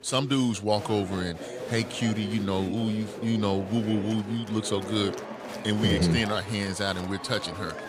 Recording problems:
chatter from many people; noticeable; throughout; 10 dB below the speech

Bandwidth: 15.5 kHz